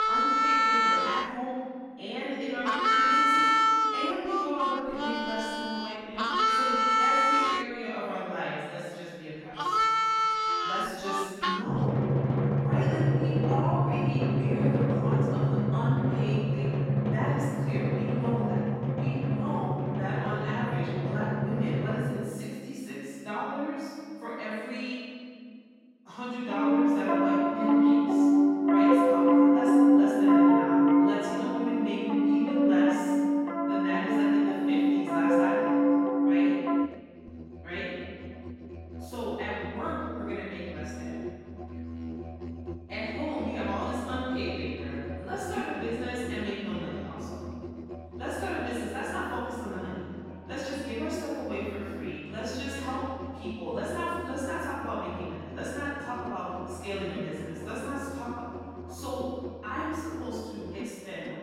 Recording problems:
room echo; strong; dies away in 2.1 s
off-mic speech; far
echo of what is said; faint; from 48 s on; 420 ms later, 25 dB below the speech
background music; very loud; throughout; 9 dB above the speech

